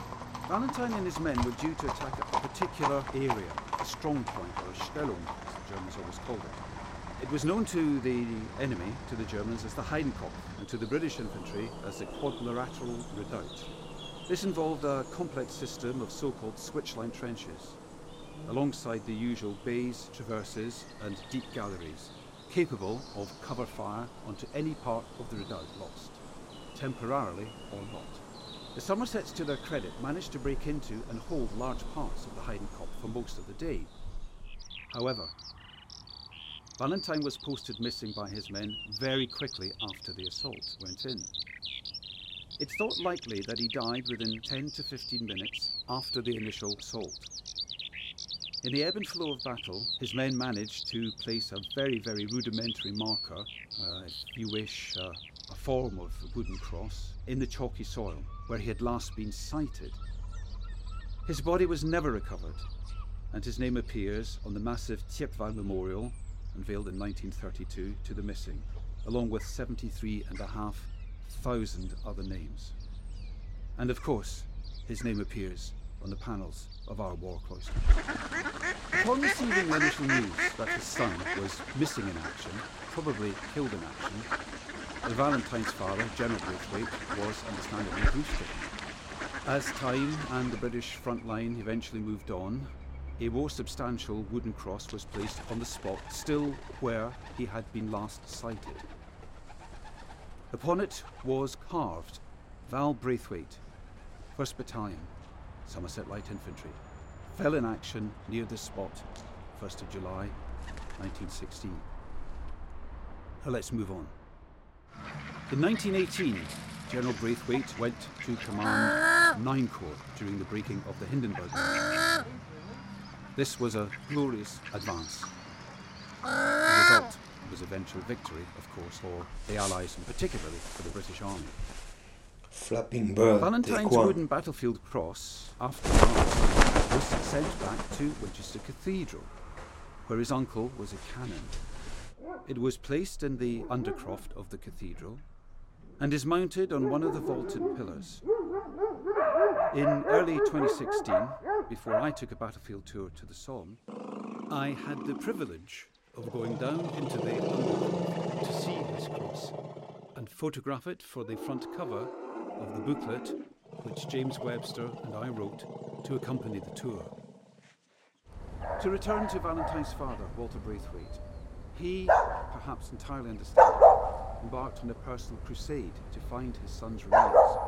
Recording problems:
animal sounds; very loud; throughout; 3 dB above the speech

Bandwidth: 16 kHz